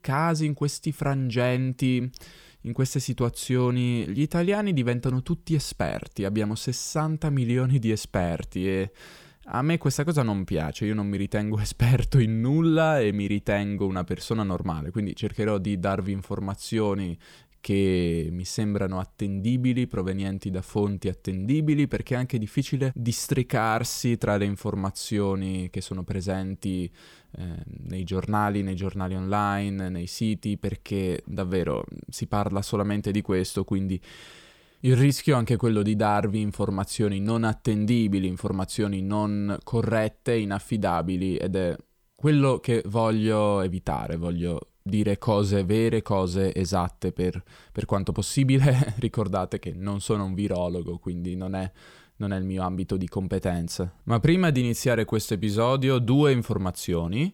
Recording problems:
none

